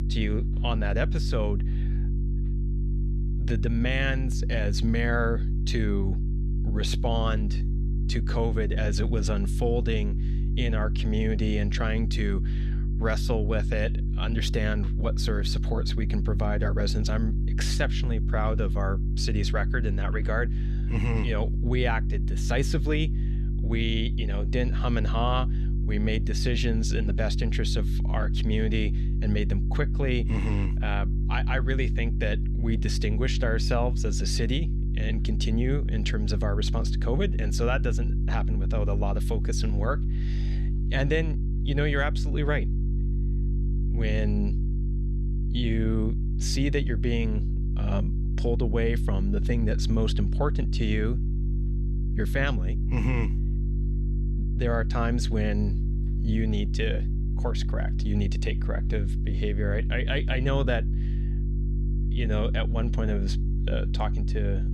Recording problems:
electrical hum; noticeable; throughout; 50 Hz, 10 dB below the speech

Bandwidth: 14.5 kHz